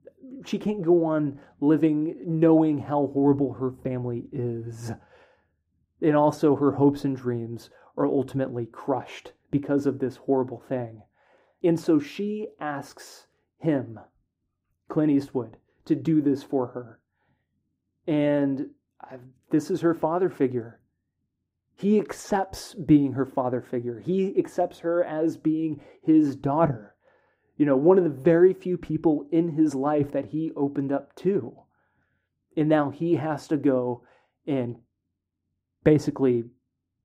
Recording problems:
muffled; very; fading above 2 kHz

